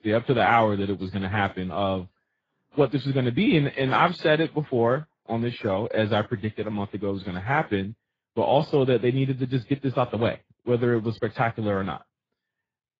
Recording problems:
garbled, watery; badly; nothing above 7.5 kHz

